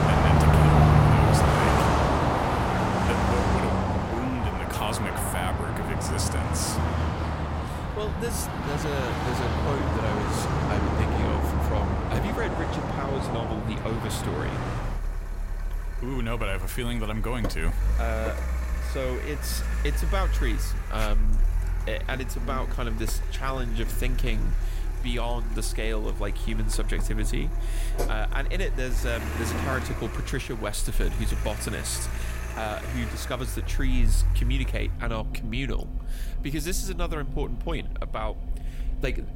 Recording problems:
traffic noise; very loud; throughout; 5 dB above the speech

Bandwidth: 16 kHz